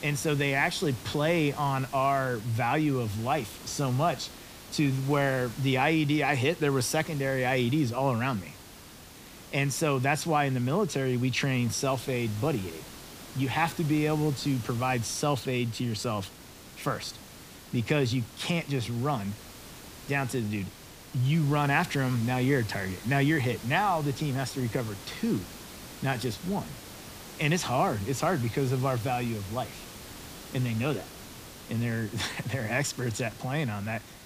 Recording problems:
hiss; noticeable; throughout; 15 dB below the speech

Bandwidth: 15 kHz